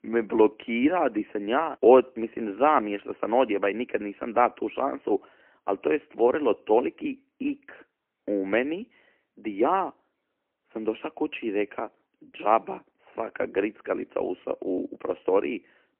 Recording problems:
phone-call audio; poor line; nothing above 3 kHz

